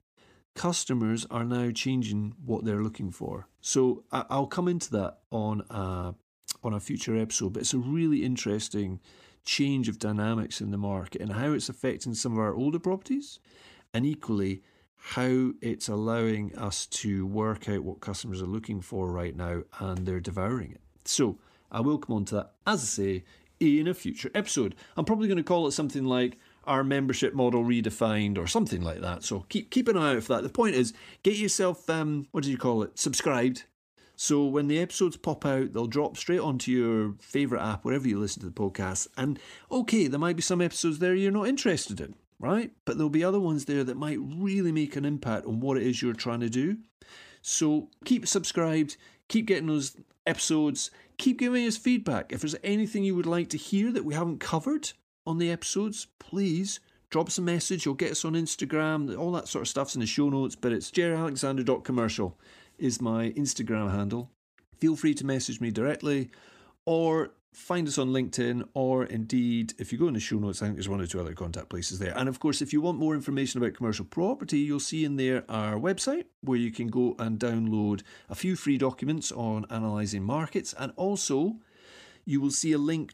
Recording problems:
none

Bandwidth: 15 kHz